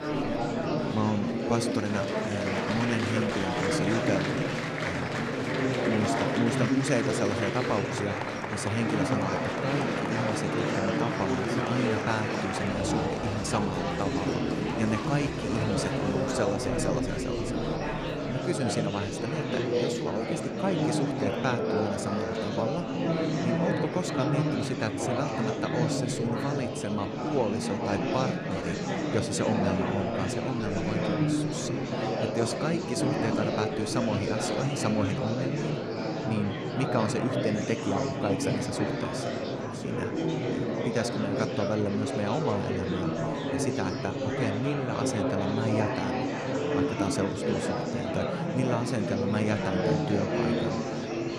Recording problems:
murmuring crowd; very loud; throughout; 3 dB above the speech

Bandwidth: 14.5 kHz